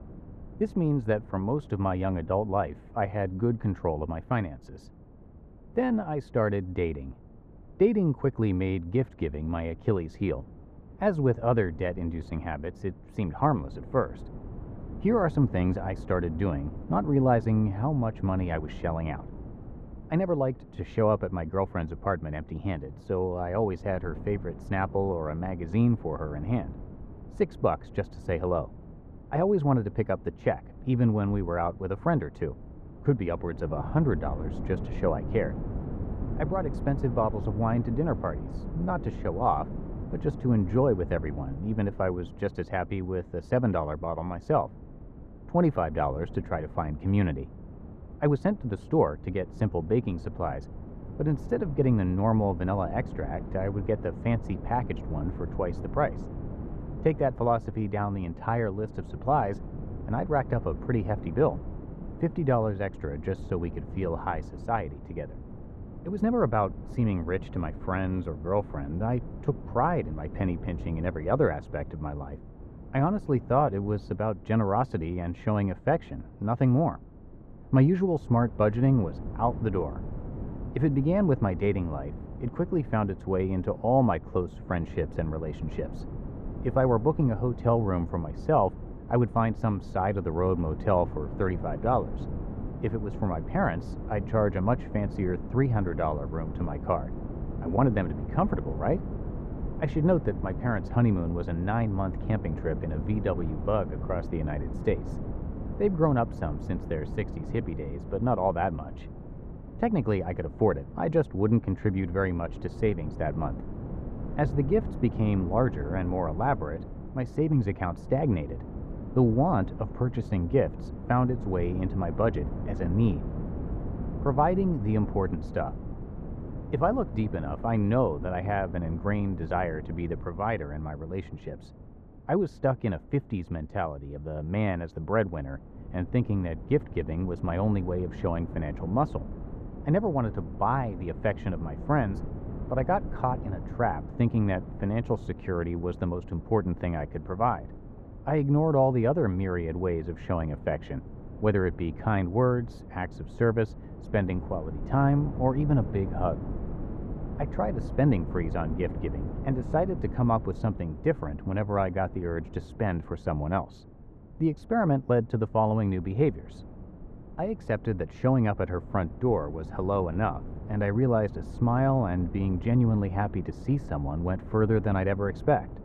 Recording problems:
muffled; very; fading above 3.5 kHz
wind noise on the microphone; occasional gusts; 15 dB below the speech

